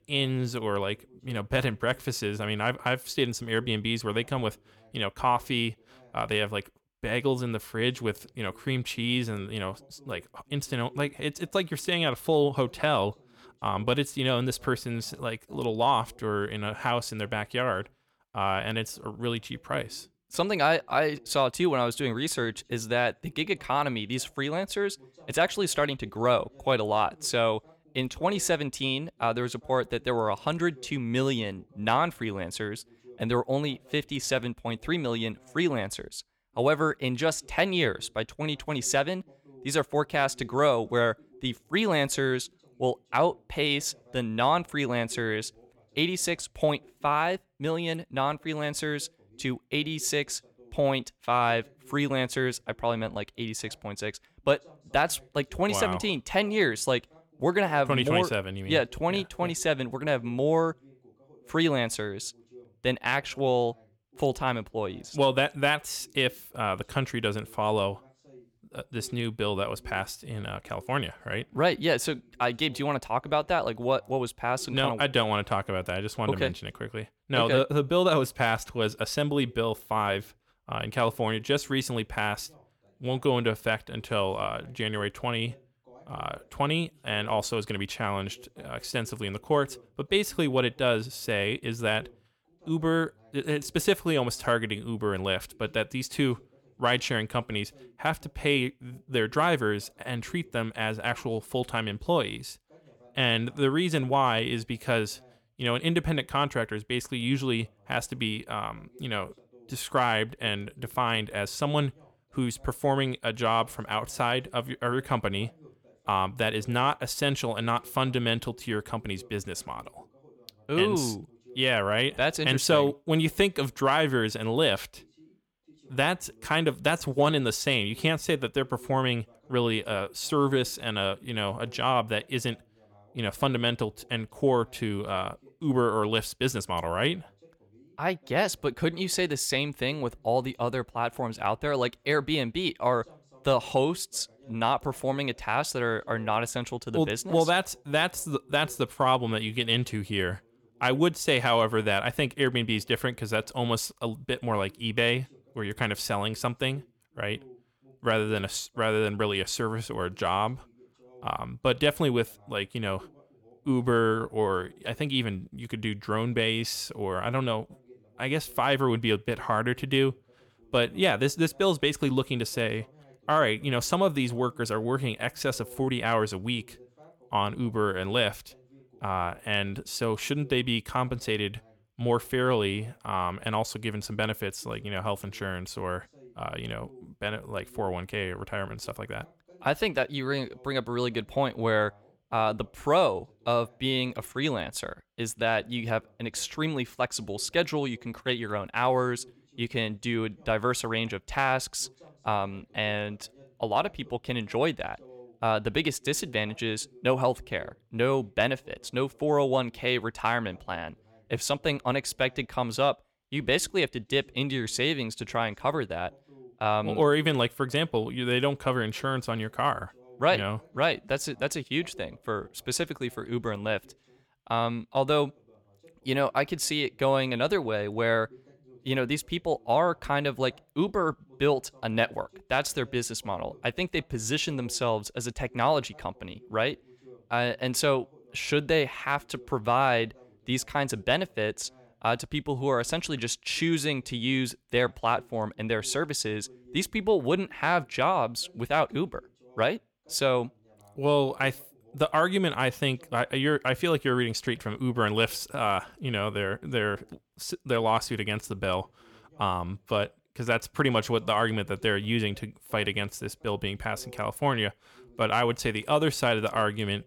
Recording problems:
voice in the background; faint; throughout; 30 dB below the speech

